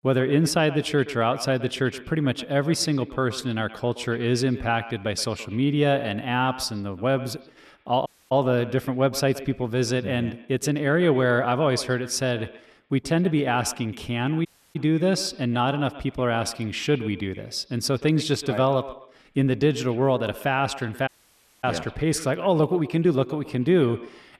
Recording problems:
echo of what is said; noticeable; throughout; 120 ms later, 15 dB below the speech
audio cutting out; at 8 s, at 14 s and at 21 s for 0.5 s

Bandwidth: 13.5 kHz